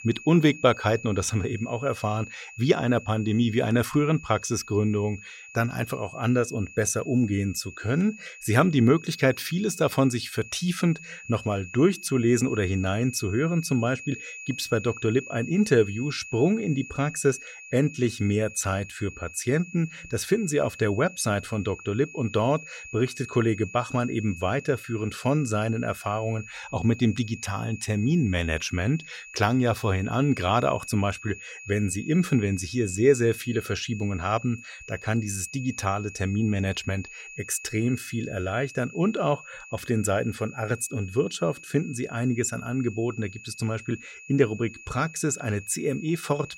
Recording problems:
high-pitched whine; noticeable; throughout; 2.5 kHz, 15 dB below the speech

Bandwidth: 16 kHz